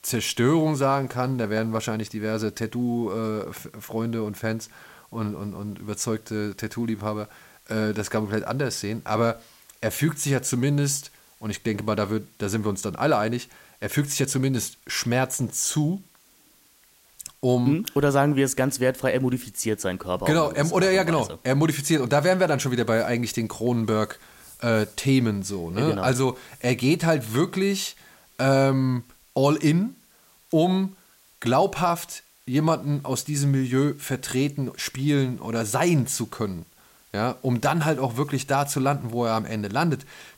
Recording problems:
hiss; faint; throughout; 30 dB below the speech

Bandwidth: 16 kHz